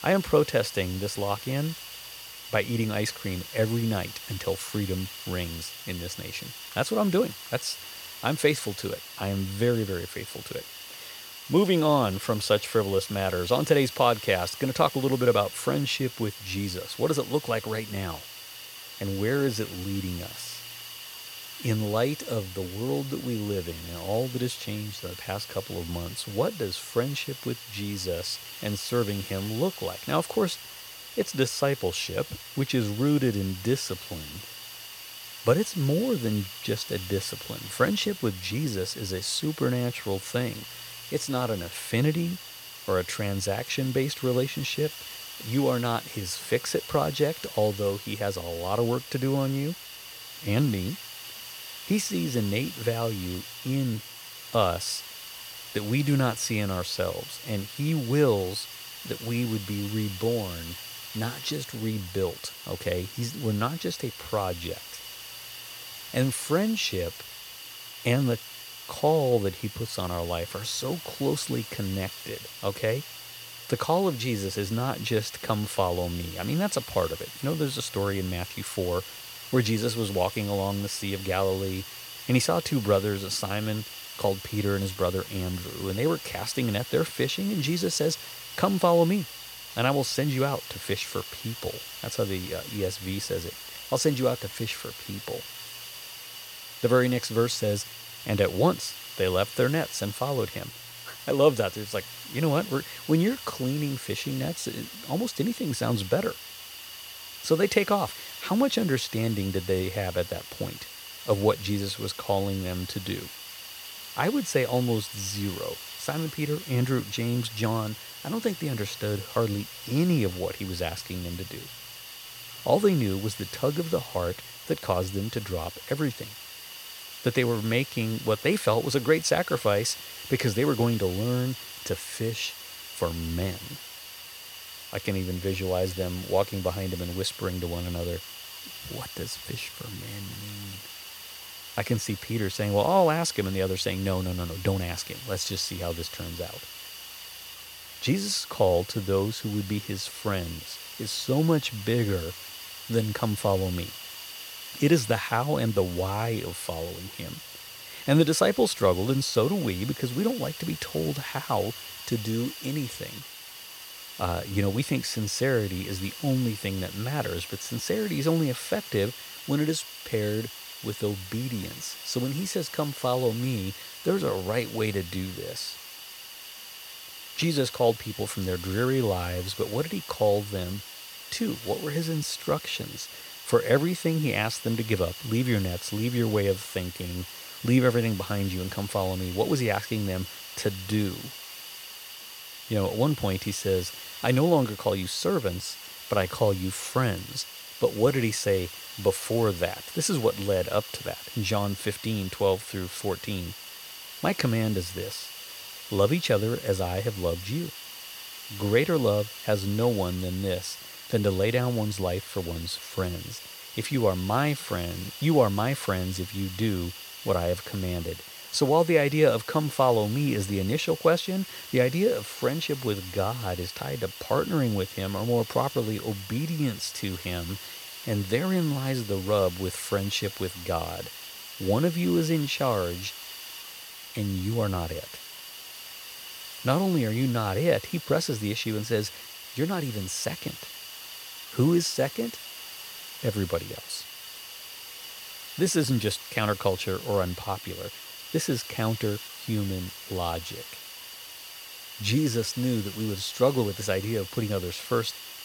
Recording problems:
hiss; noticeable; throughout; 10 dB below the speech

